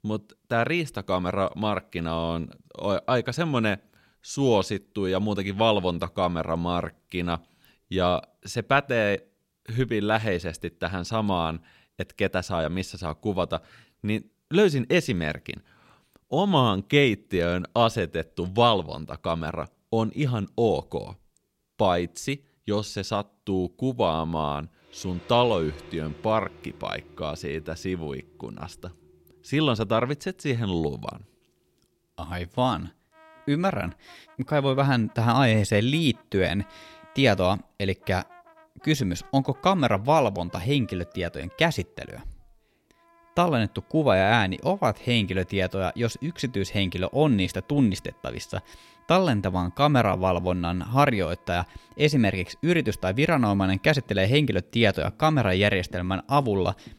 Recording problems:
background music; faint; from 25 s on; 30 dB below the speech

